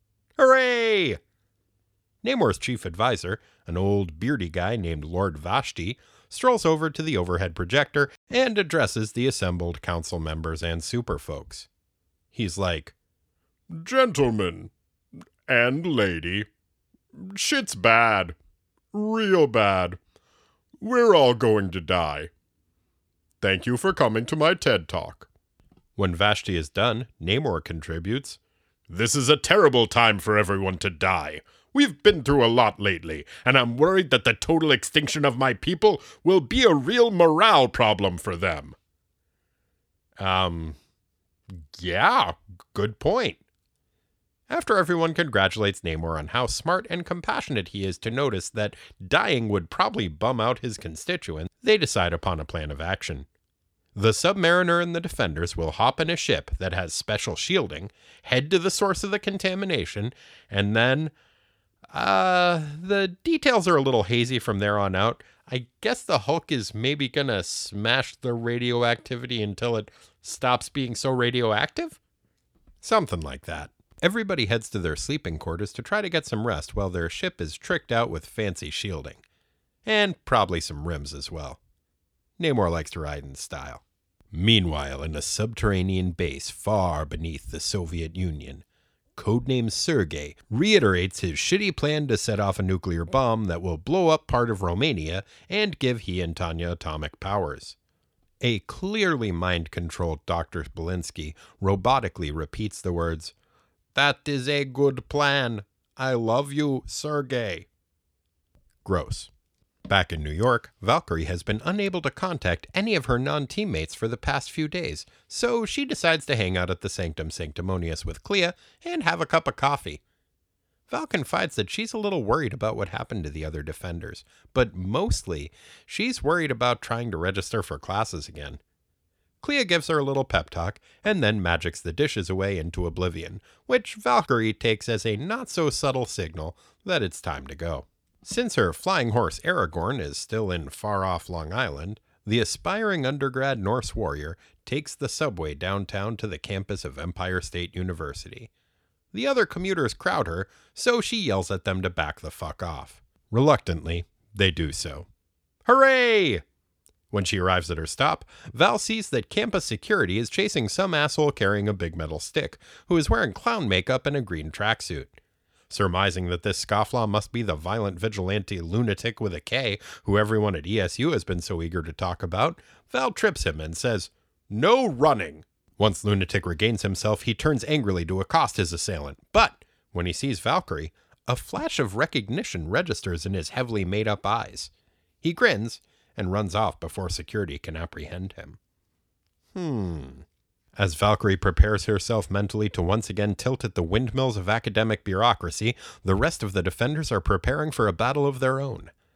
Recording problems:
none

